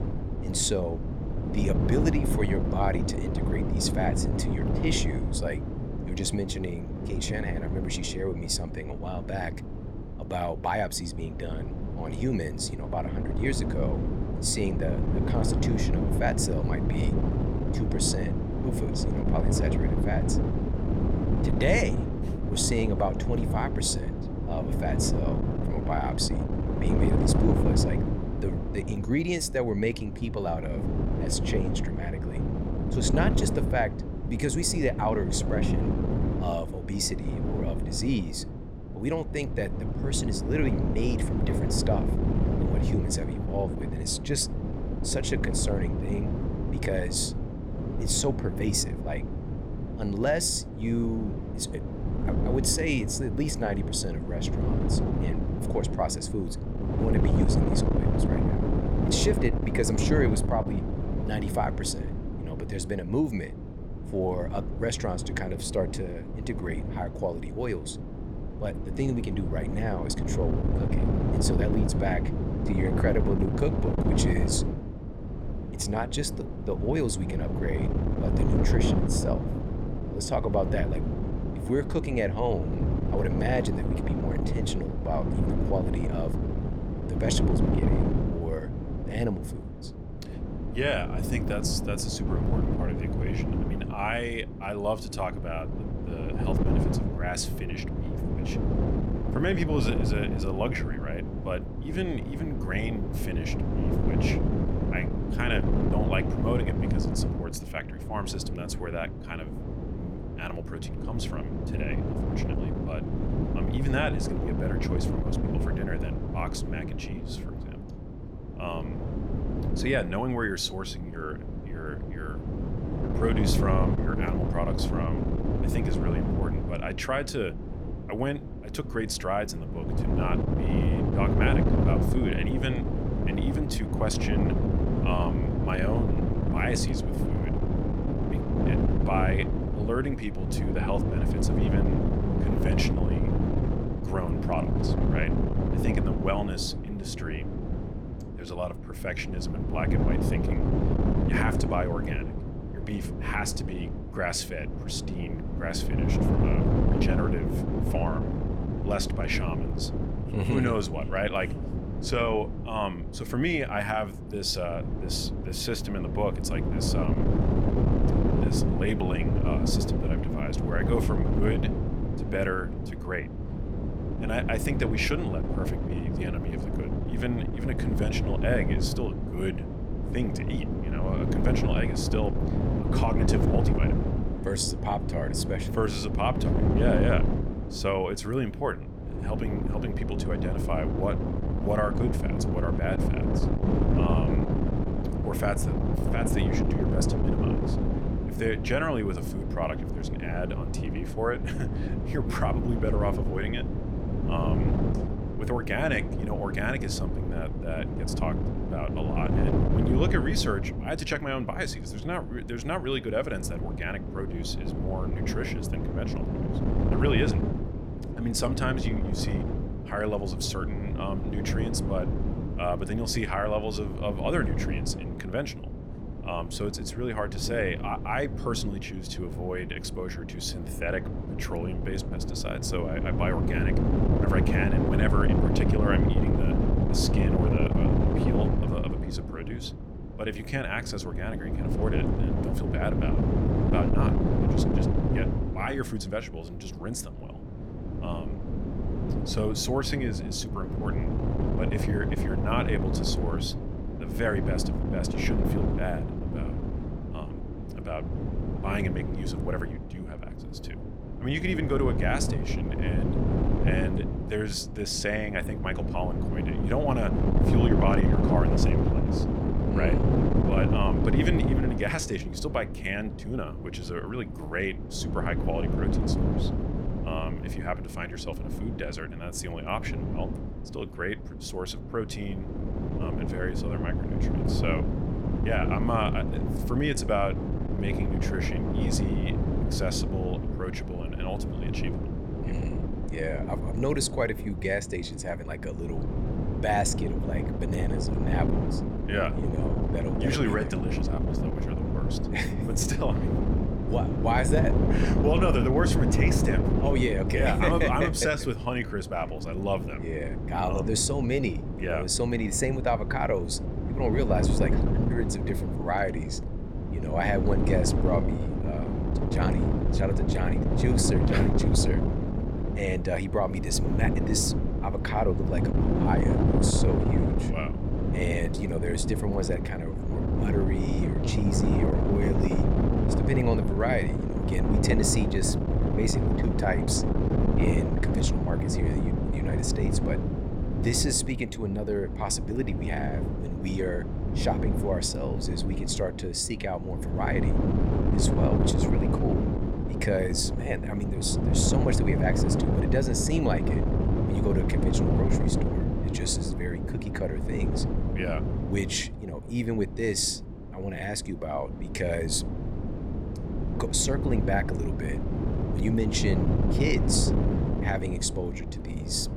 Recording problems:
wind noise on the microphone; heavy; 3 dB below the speech

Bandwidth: 18.5 kHz